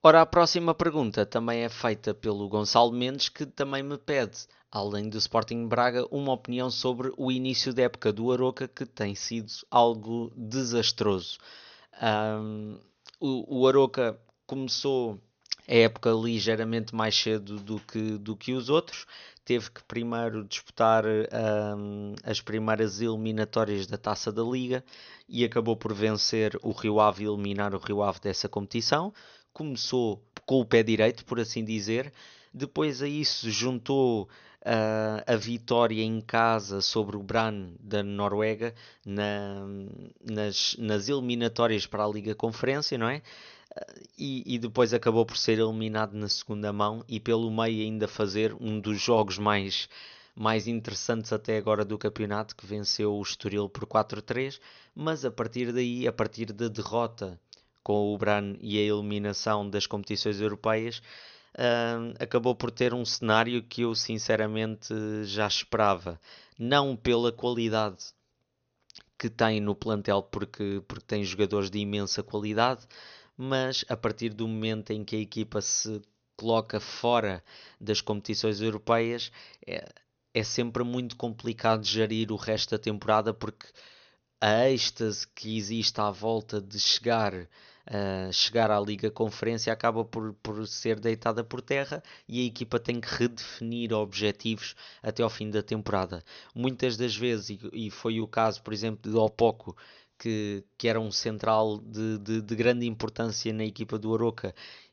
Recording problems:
high frequencies cut off; noticeable; nothing above 6.5 kHz

